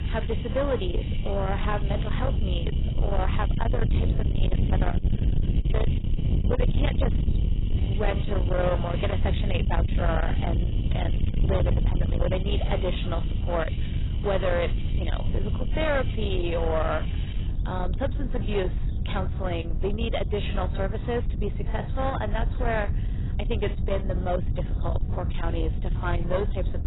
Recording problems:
distortion; heavy; 8 dB below the speech
garbled, watery; badly; nothing above 4 kHz
wind noise on the microphone; heavy; 8 dB below the speech
animal sounds; noticeable; throughout; 15 dB below the speech

